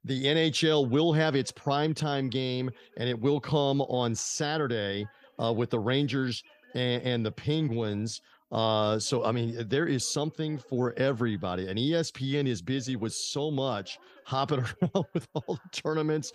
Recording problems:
voice in the background; faint; throughout; 30 dB below the speech

